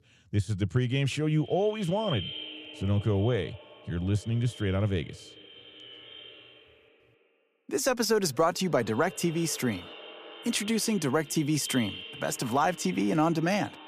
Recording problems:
echo of what is said; noticeable; throughout; 360 ms later, 15 dB below the speech

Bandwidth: 15 kHz